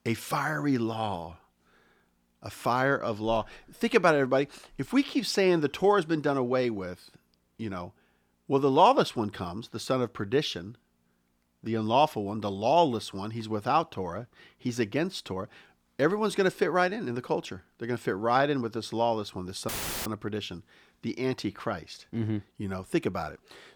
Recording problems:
audio cutting out; filled with static; at 20 s

